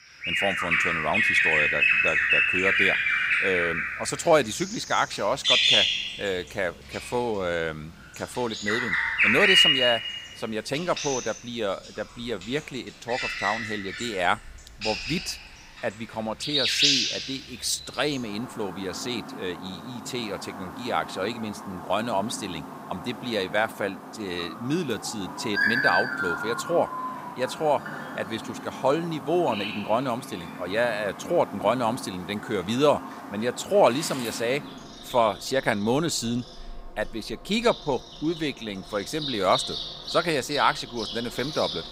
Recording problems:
animal sounds; very loud; throughout; 4 dB above the speech

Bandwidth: 15.5 kHz